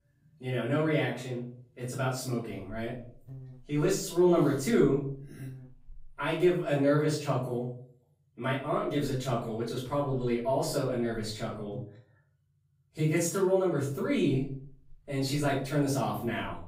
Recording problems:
off-mic speech; far
room echo; noticeable; dies away in 0.5 s
electrical hum; faint; from 2.5 to 6.5 s, from 8.5 to 12 s and from 14 s on; 60 Hz, 30 dB below the speech

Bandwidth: 15.5 kHz